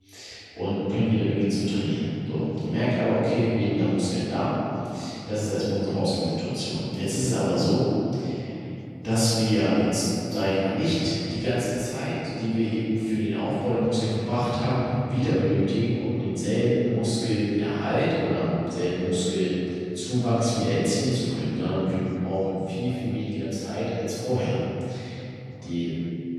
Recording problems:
room echo; strong; dies away in 2.9 s
off-mic speech; far
voice in the background; faint; throughout; 30 dB below the speech

